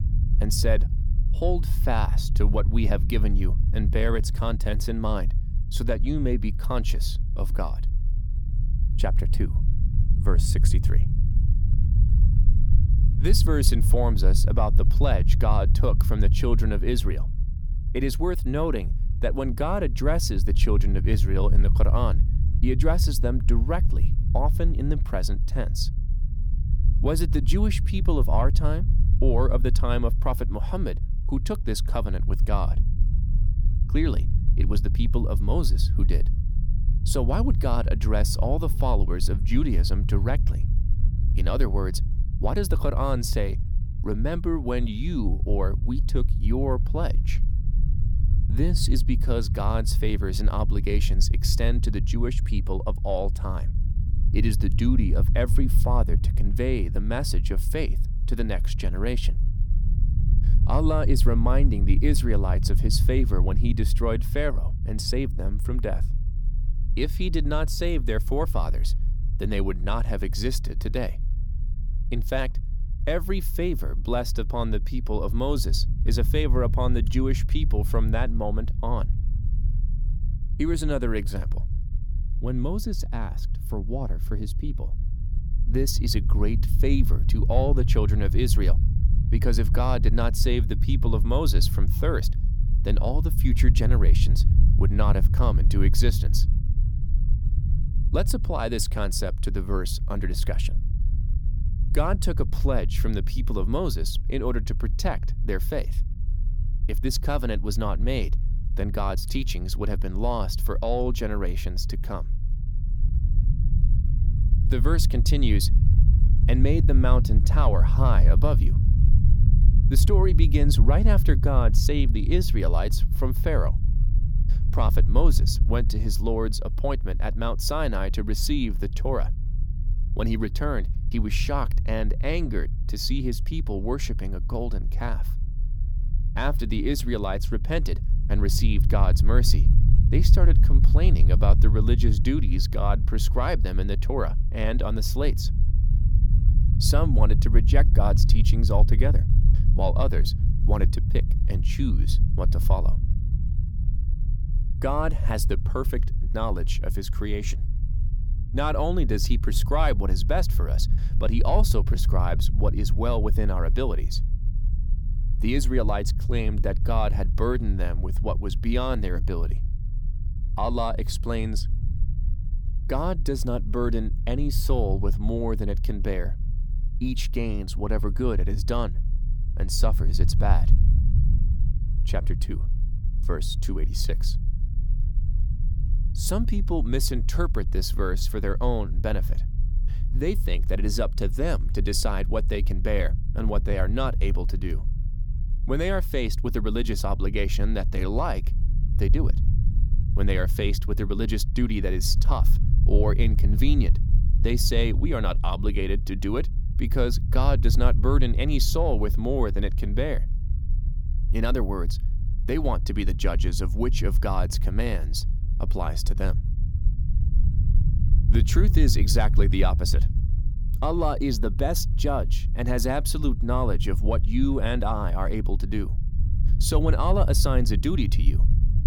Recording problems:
low rumble; noticeable; throughout; 10 dB below the speech

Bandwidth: 18.5 kHz